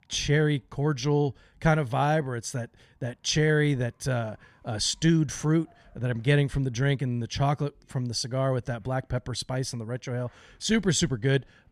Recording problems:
none

